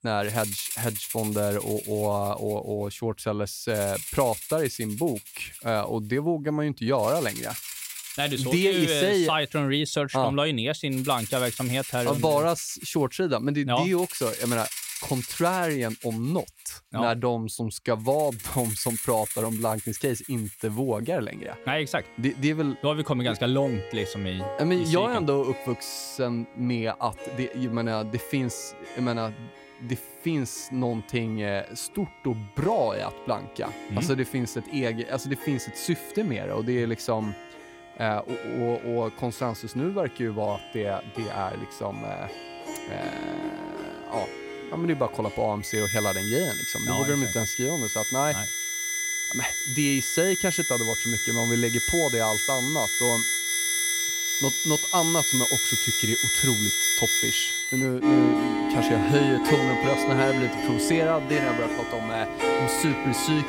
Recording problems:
background music; very loud; throughout; 1 dB above the speech

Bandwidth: 16 kHz